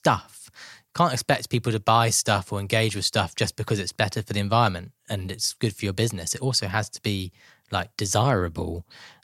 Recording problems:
none

